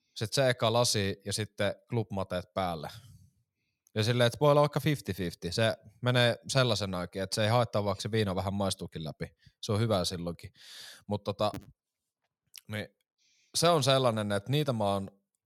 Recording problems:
none

